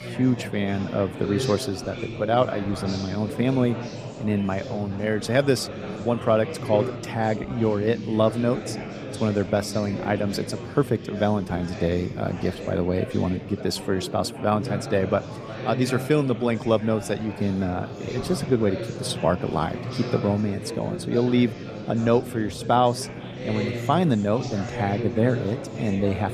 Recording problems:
chatter from many people; loud; throughout; 8 dB below the speech

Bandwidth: 15 kHz